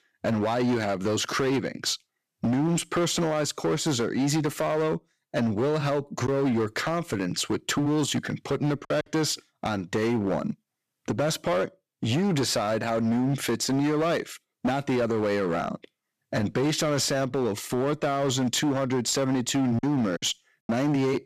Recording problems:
distortion; slight; 16% of the sound clipped
choppy; occasionally; from 6.5 to 9 s and at 20 s; 4% of the speech affected

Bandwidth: 14.5 kHz